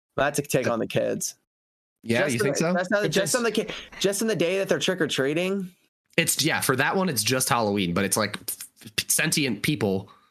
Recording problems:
squashed, flat; heavily

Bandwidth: 13.5 kHz